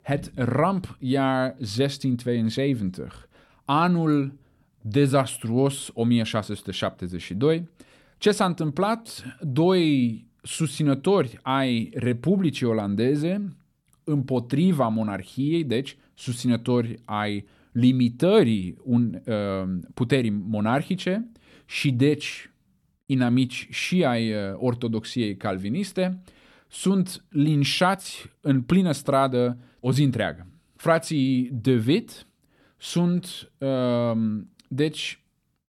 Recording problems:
none

